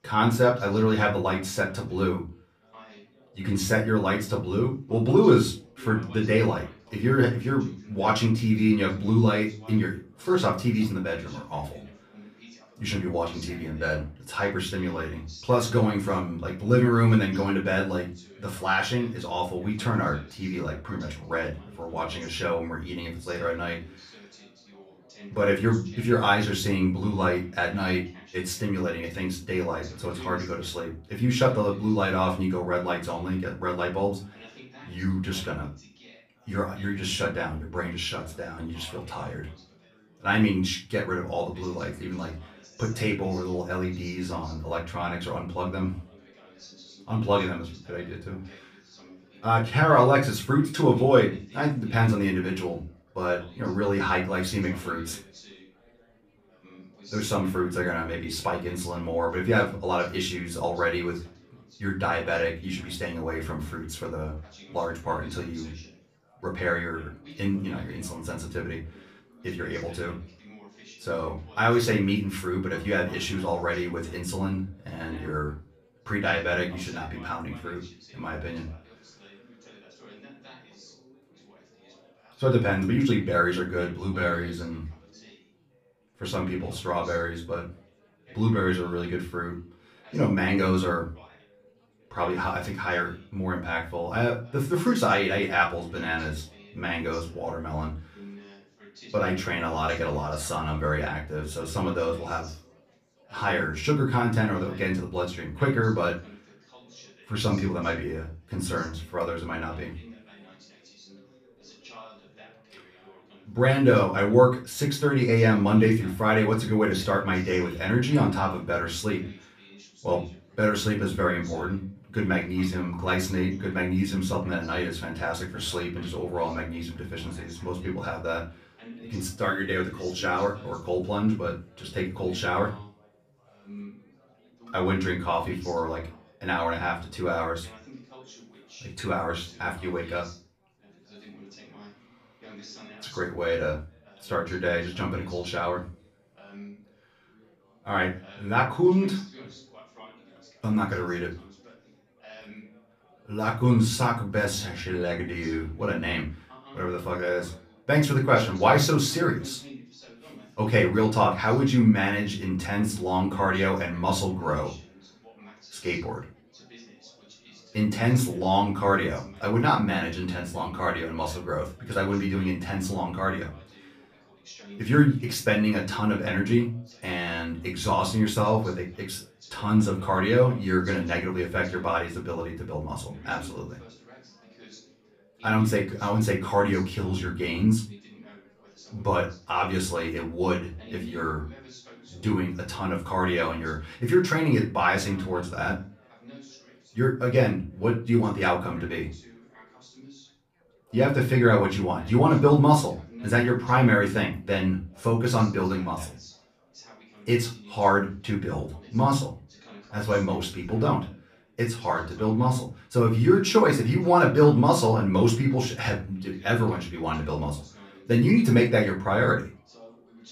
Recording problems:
off-mic speech; far
room echo; very slight; dies away in 0.3 s
background chatter; faint; throughout; 4 voices, 25 dB below the speech

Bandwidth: 15 kHz